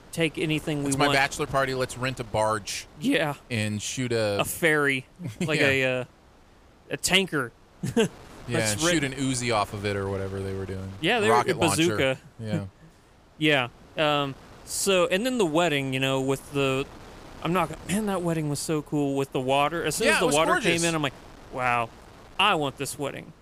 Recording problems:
wind noise on the microphone; occasional gusts; 25 dB below the speech

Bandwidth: 15 kHz